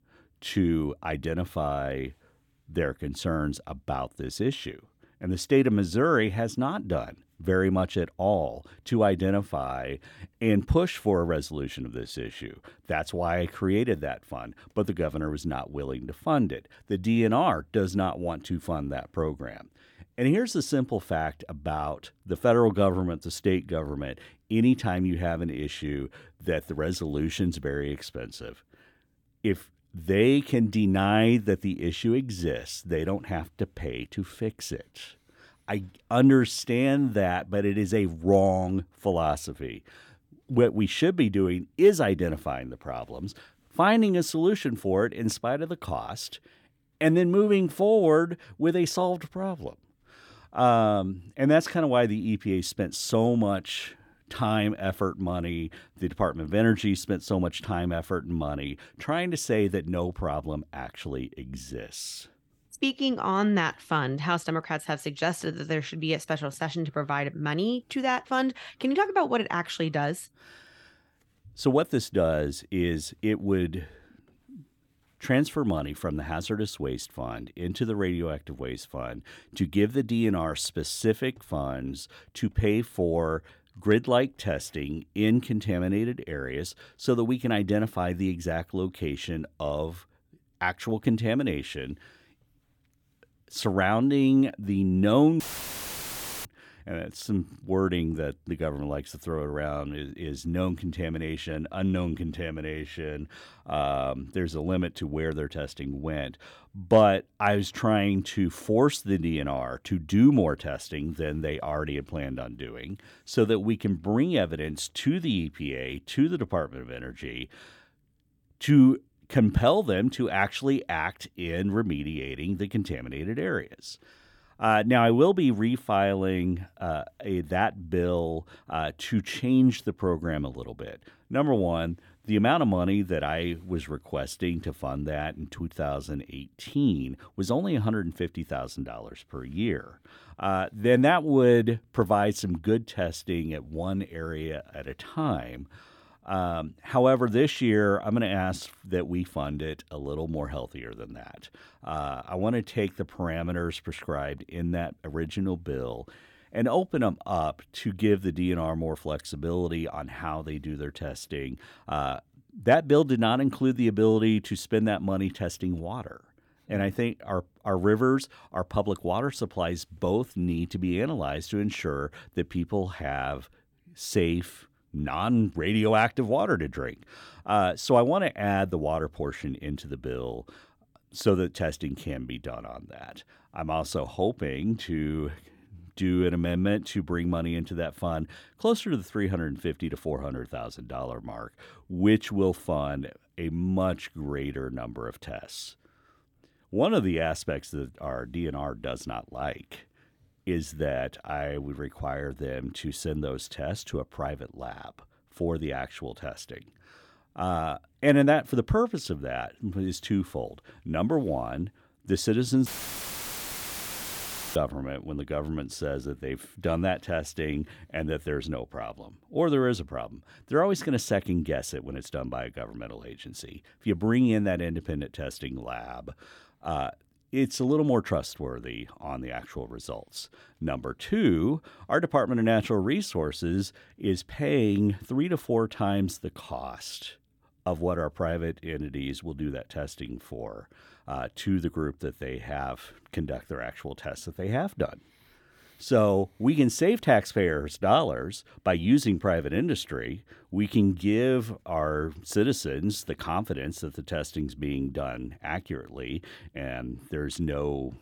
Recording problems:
audio cutting out; filled with static; at 1:35 for 1 s and at 3:33 for 2 s

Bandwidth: 19 kHz